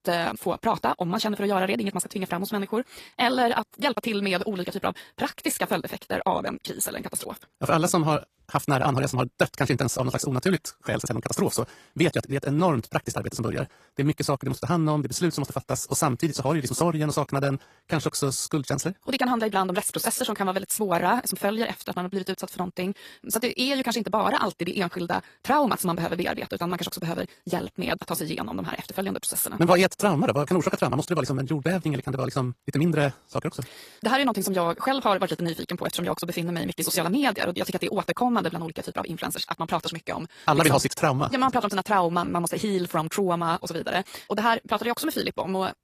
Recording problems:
wrong speed, natural pitch; too fast; 1.8 times normal speed
garbled, watery; slightly; nothing above 14.5 kHz

